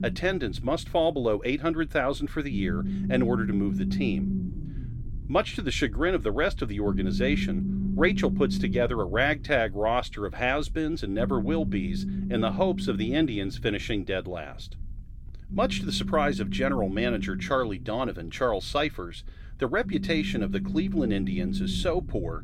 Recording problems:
low rumble; noticeable; throughout; 10 dB below the speech

